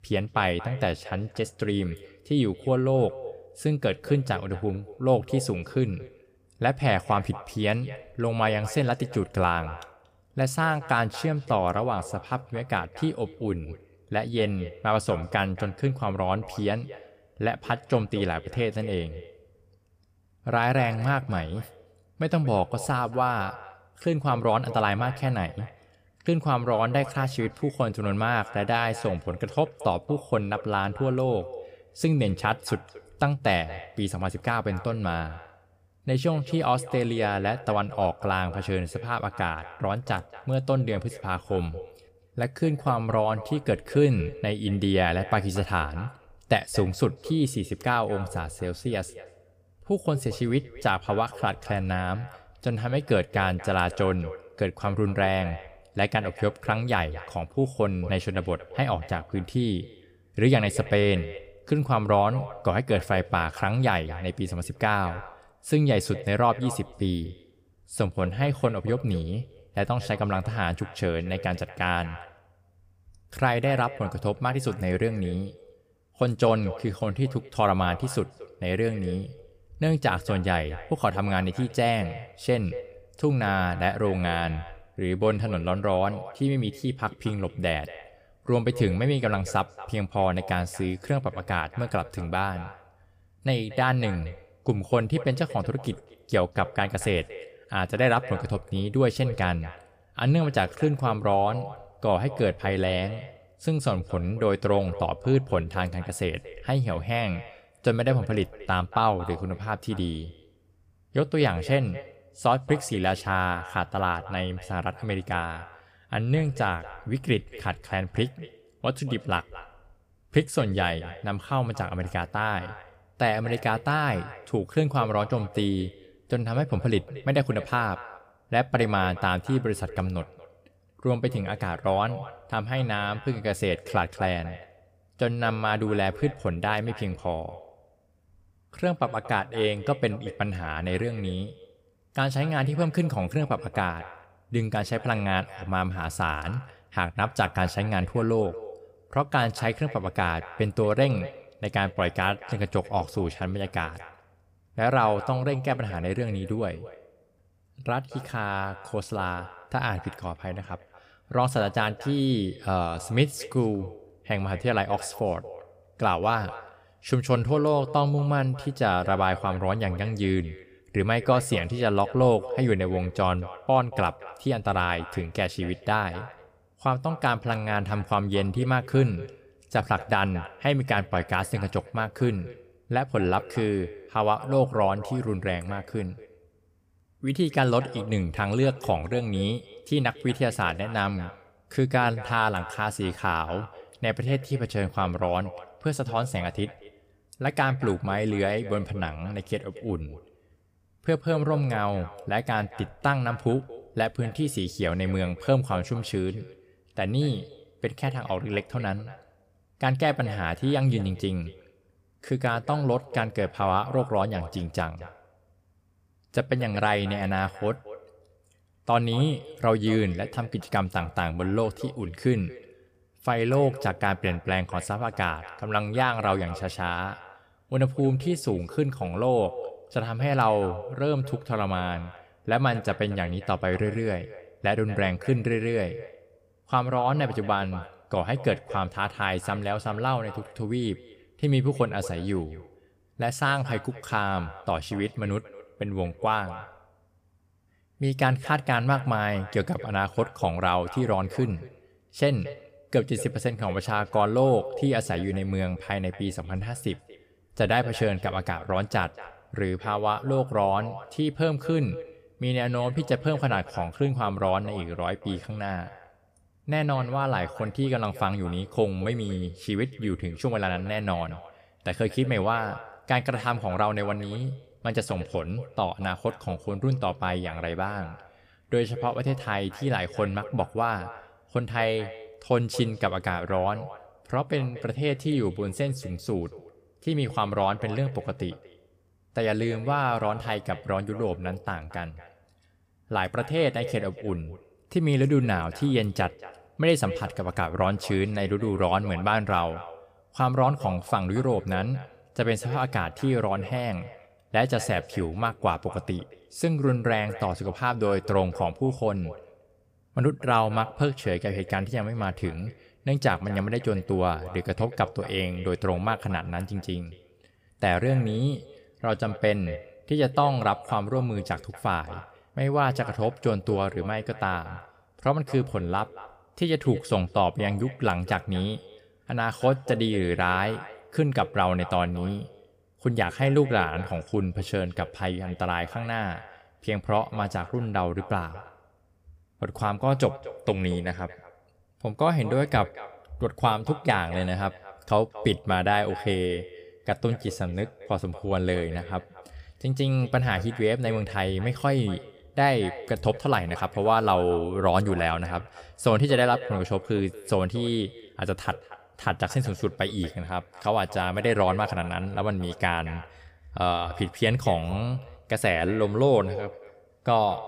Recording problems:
echo of what is said; noticeable; throughout; 230 ms later, 15 dB below the speech

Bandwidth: 15 kHz